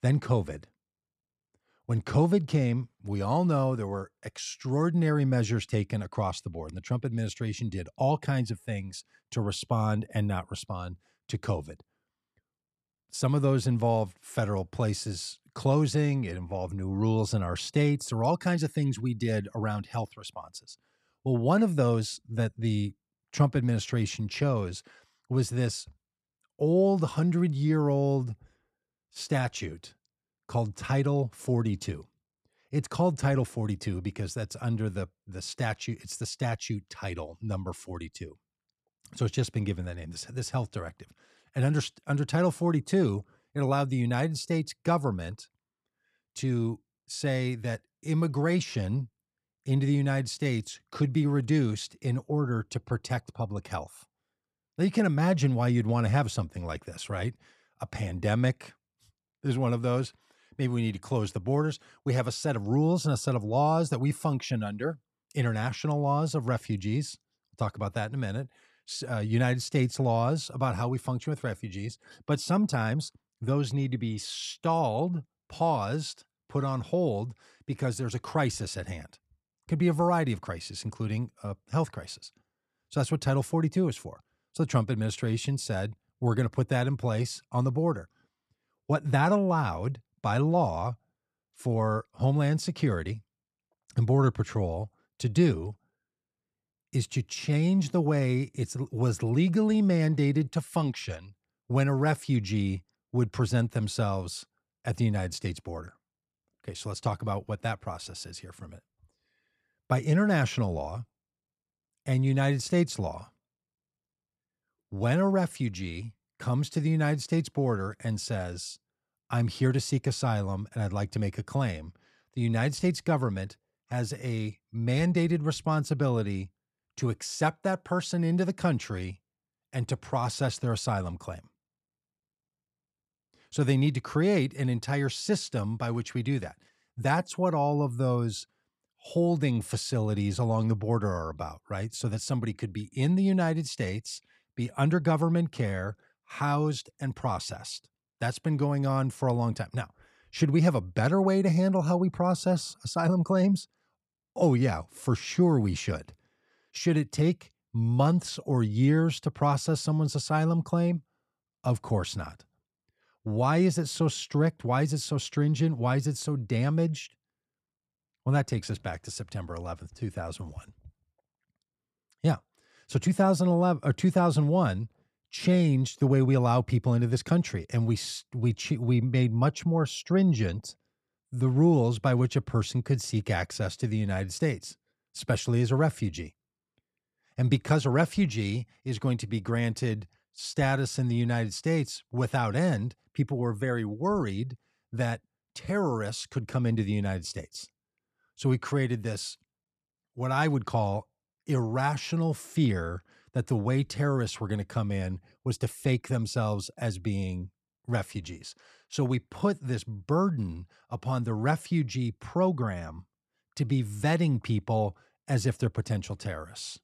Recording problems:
none

